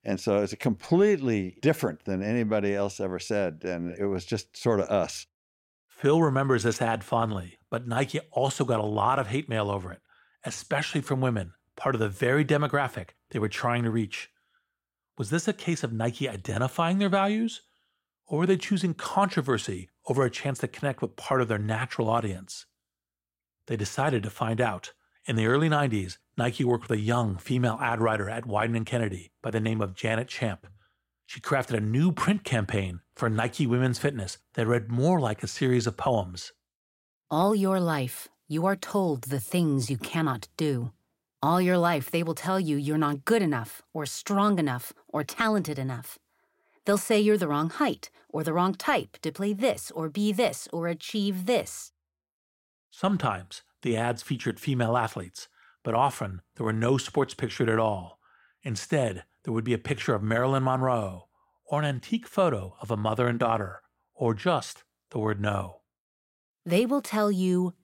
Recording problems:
none

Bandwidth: 16 kHz